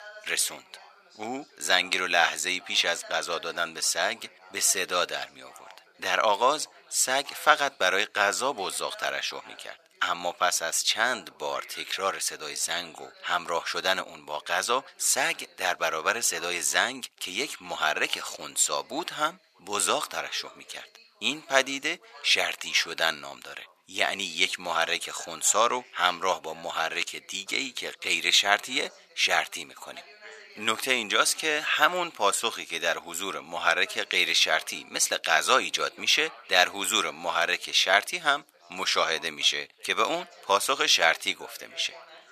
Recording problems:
thin; very; fading below 850 Hz
background chatter; faint; throughout; 2 voices, 25 dB below the speech

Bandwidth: 14.5 kHz